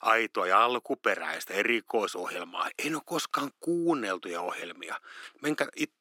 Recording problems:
thin; somewhat; fading below 250 Hz

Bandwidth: 16.5 kHz